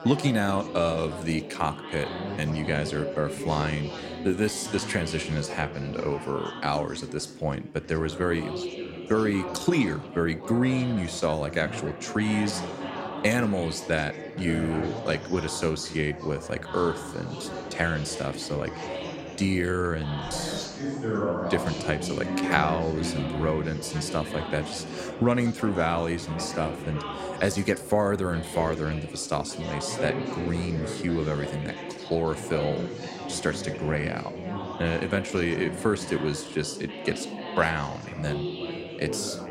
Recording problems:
chatter from many people; loud; throughout; 7 dB below the speech

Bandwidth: 16 kHz